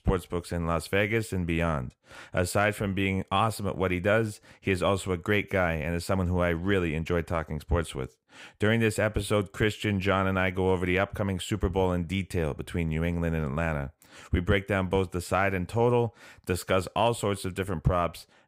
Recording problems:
none

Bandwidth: 15.5 kHz